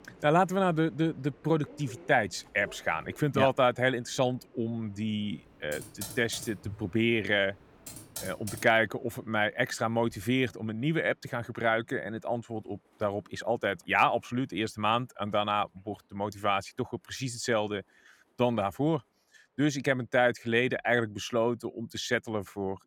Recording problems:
train or aircraft noise; faint; throughout; 30 dB below the speech
keyboard typing; noticeable; from 5.5 to 8.5 s; peak 10 dB below the speech

